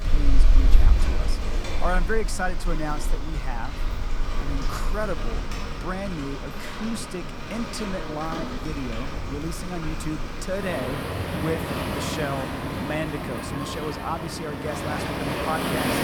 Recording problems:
rain or running water; very loud; throughout; 3 dB above the speech

